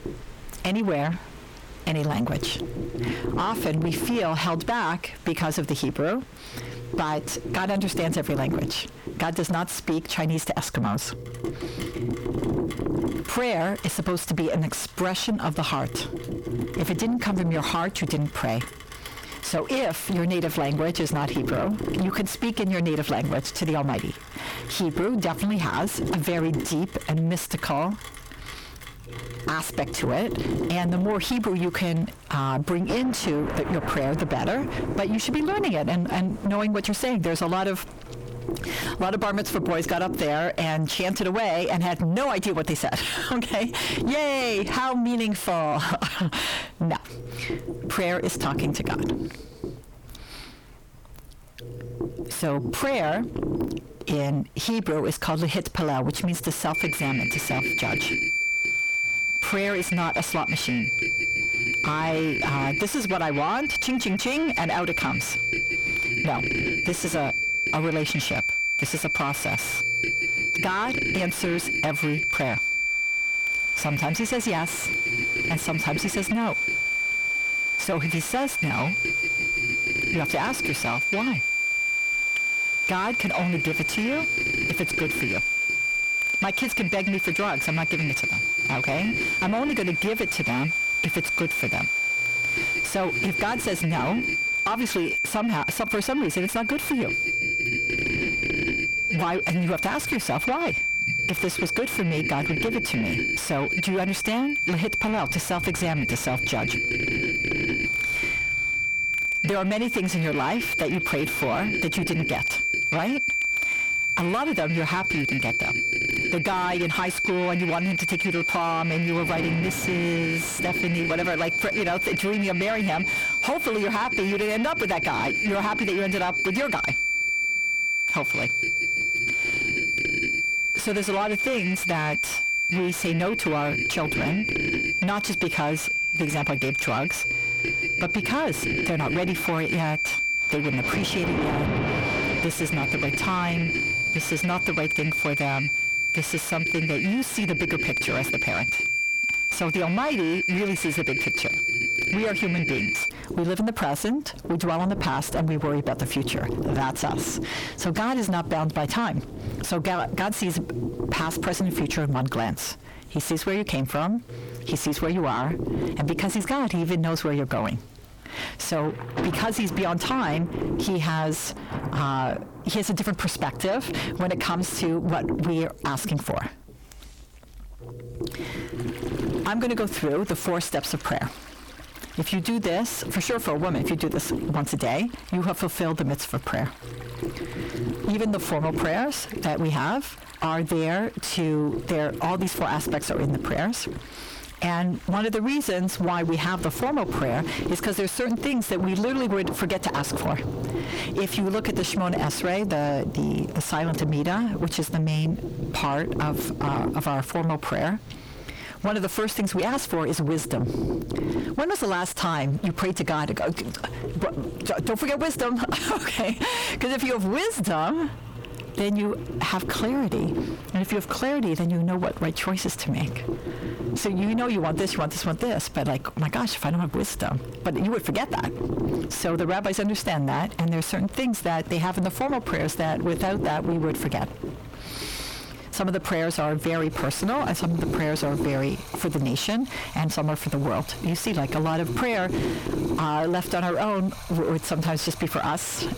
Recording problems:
distortion; heavy; 6 dB below the speech
squashed, flat; somewhat, background pumping
high-pitched whine; loud; from 57 s to 2:33; 2.5 kHz, 2 dB above the speech
low rumble; loud; throughout; 10 dB below the speech
rain or running water; noticeable; throughout; 15 dB below the speech

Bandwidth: 18.5 kHz